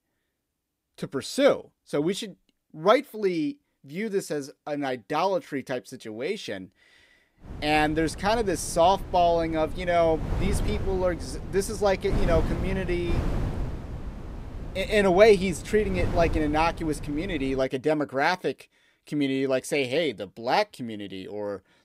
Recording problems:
wind noise on the microphone; occasional gusts; from 7.5 to 18 s; 15 dB below the speech

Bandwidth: 15.5 kHz